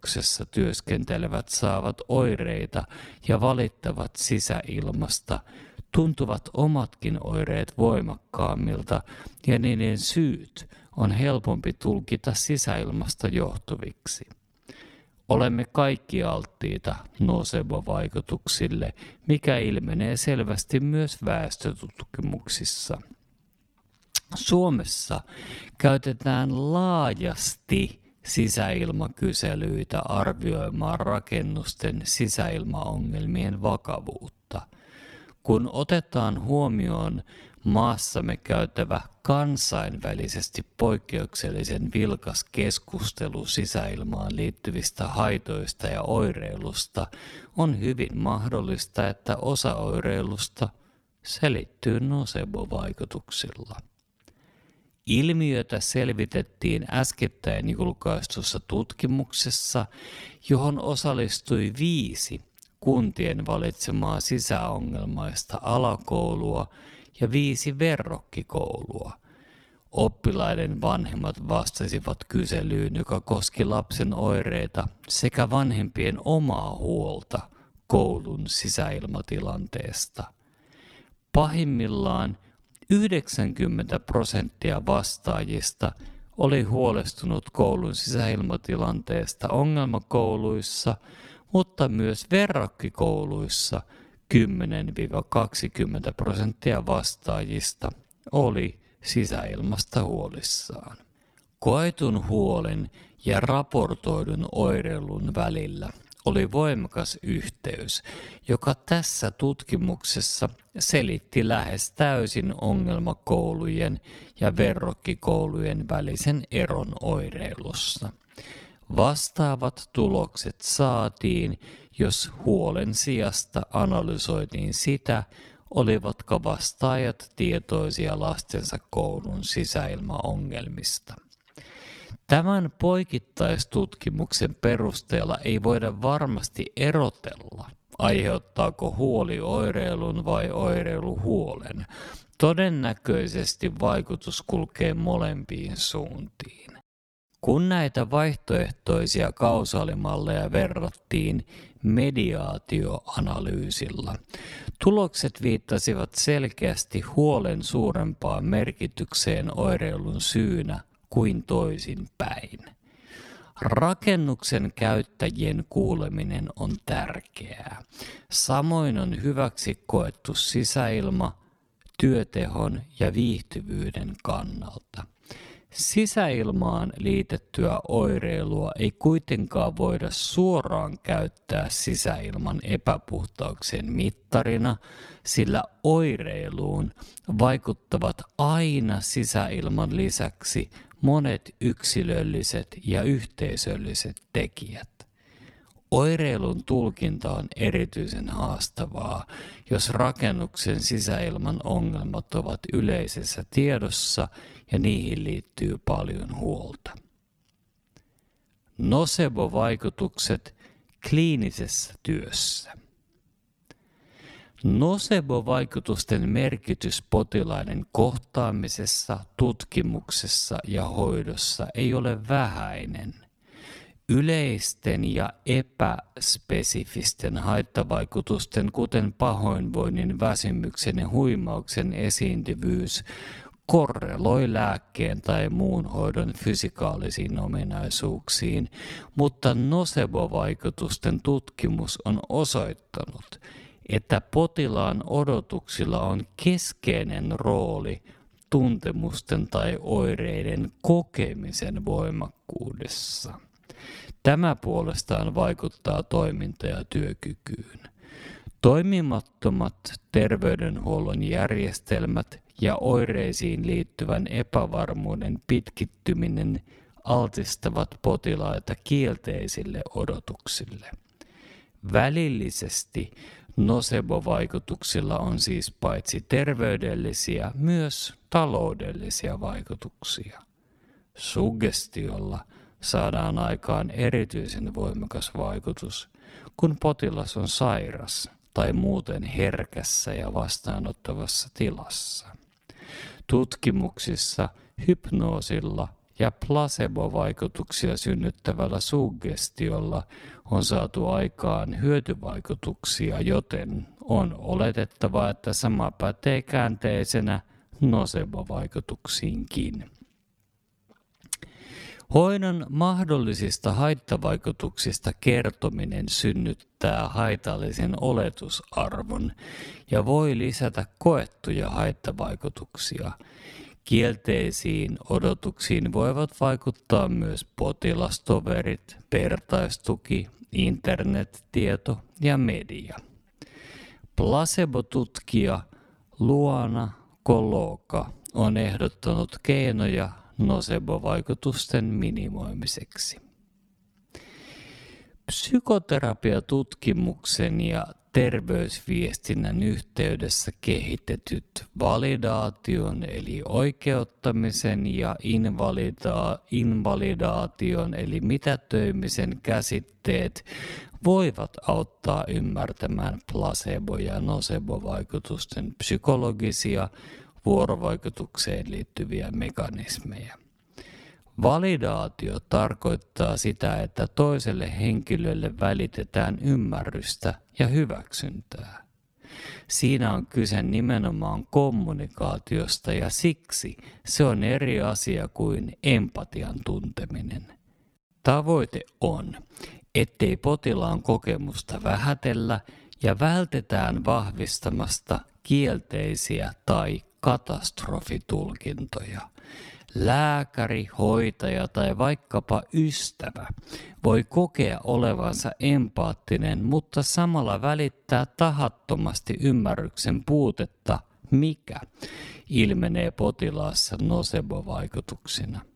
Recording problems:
wrong speed, natural pitch; too slow; 0.7 times normal speed

